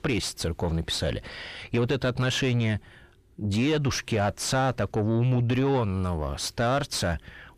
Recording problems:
distortion; slight; 9 dB below the speech

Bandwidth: 14.5 kHz